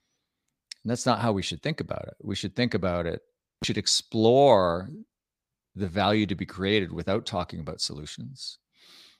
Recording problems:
none

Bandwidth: 15 kHz